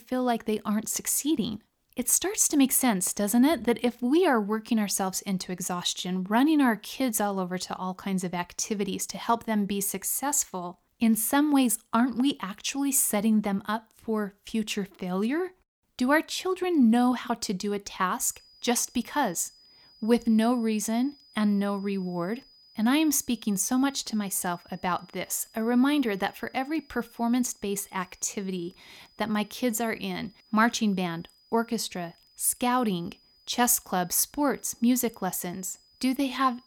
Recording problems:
high-pitched whine; faint; from 18 s on; 5 kHz, 30 dB below the speech

